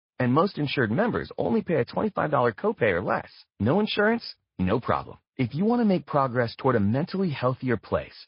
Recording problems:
garbled, watery; slightly; nothing above 5 kHz
high frequencies cut off; slight

